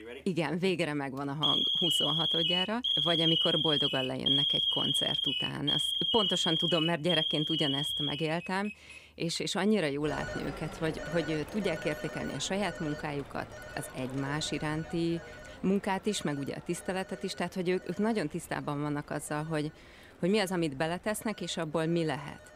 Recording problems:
alarms or sirens; very loud; throughout; 5 dB above the speech

